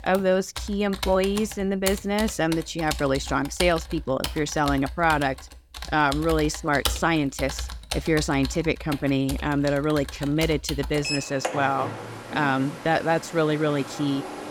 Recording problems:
household noises; loud; throughout; 9 dB below the speech

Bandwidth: 17.5 kHz